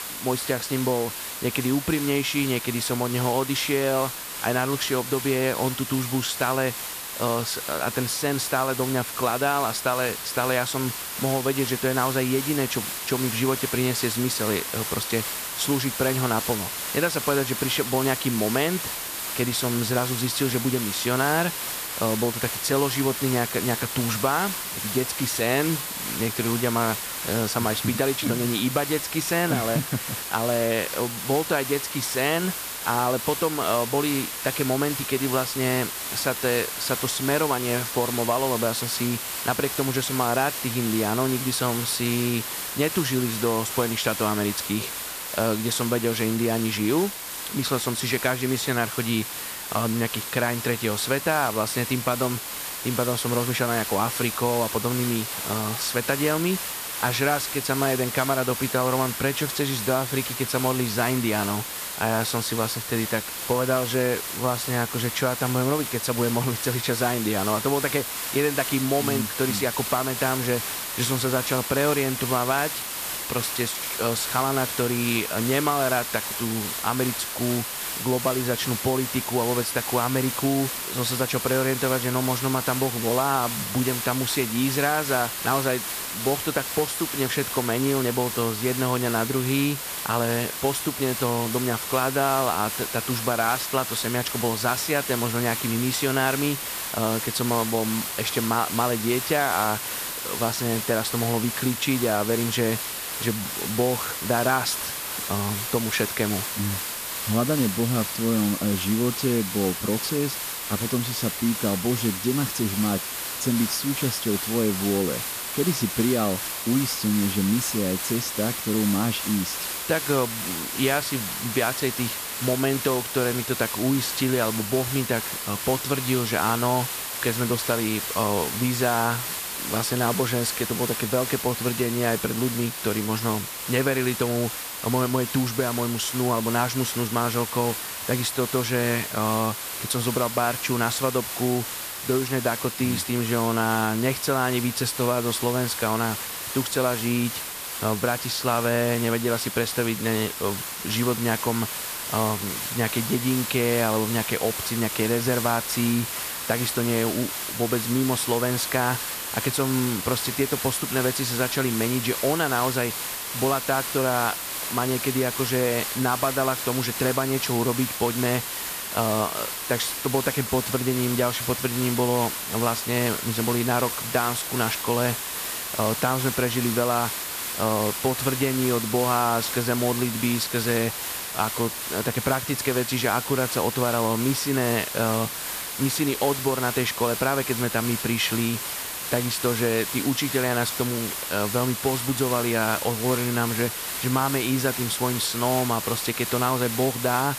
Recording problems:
hiss; loud; throughout; 3 dB below the speech

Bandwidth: 14.5 kHz